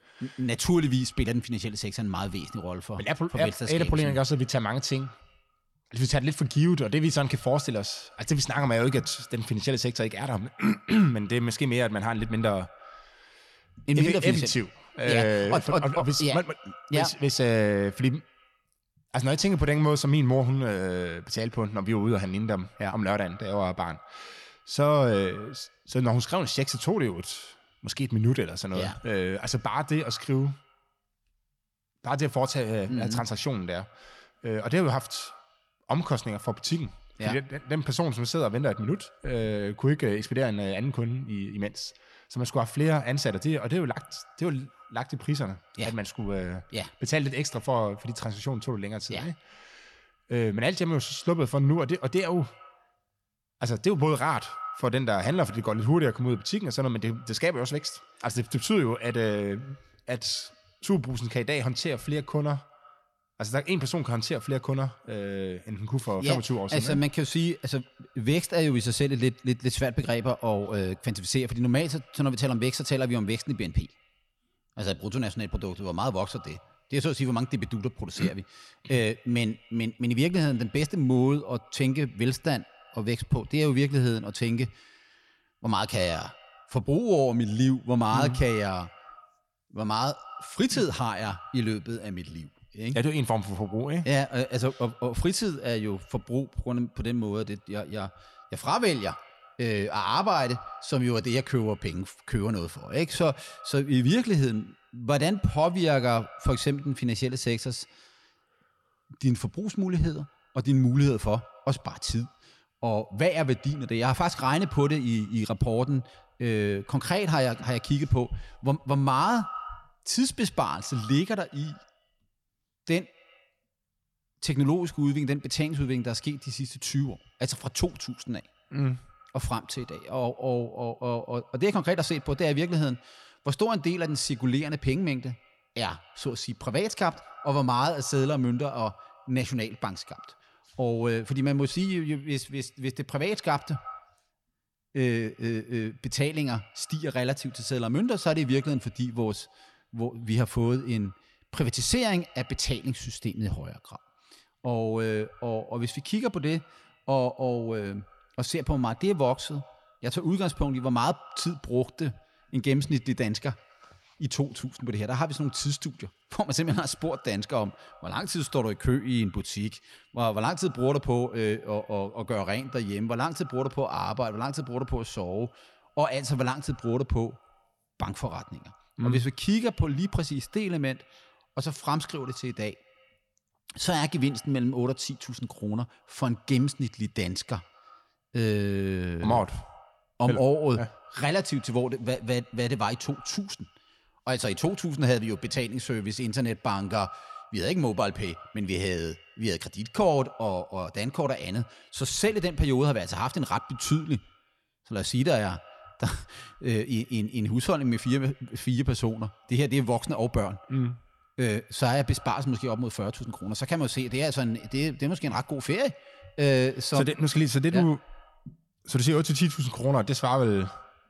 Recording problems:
echo of what is said; faint; throughout; 110 ms later, 25 dB below the speech

